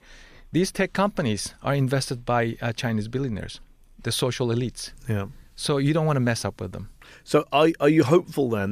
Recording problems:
abrupt cut into speech; at the end

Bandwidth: 14.5 kHz